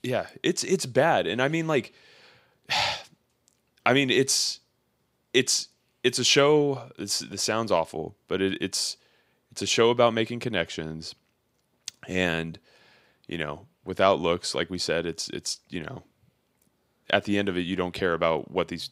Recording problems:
none

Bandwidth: 15.5 kHz